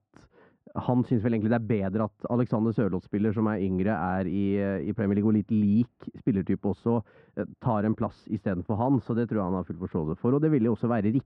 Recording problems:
muffled; very; fading above 1.5 kHz

